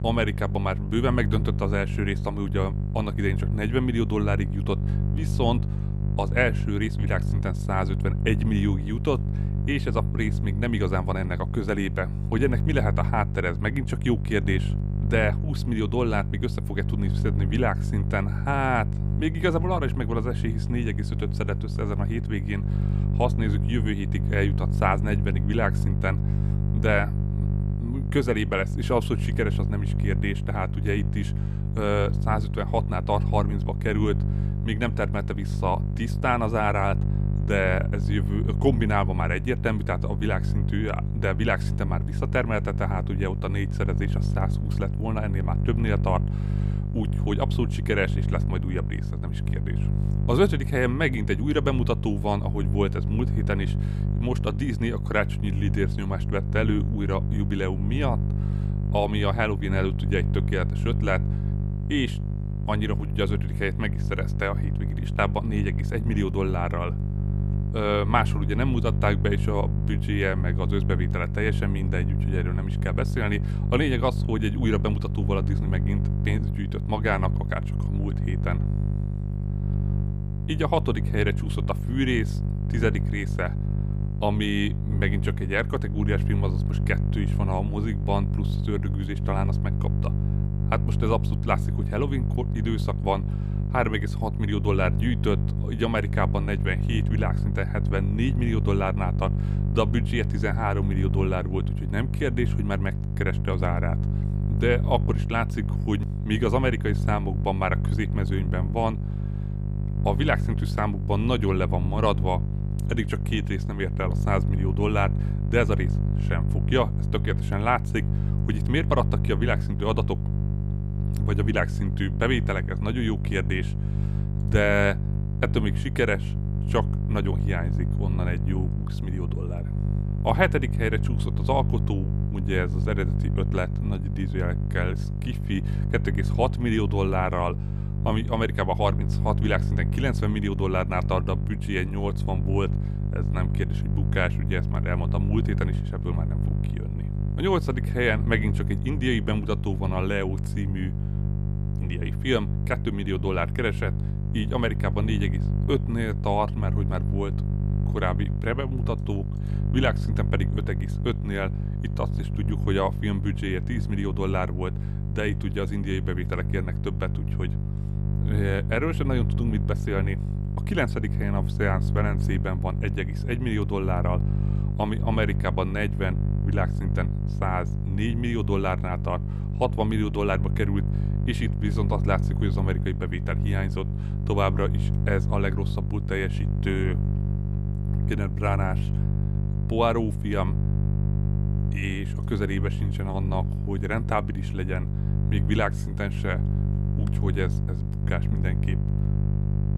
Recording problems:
electrical hum; loud; throughout; 50 Hz, 10 dB below the speech

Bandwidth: 14.5 kHz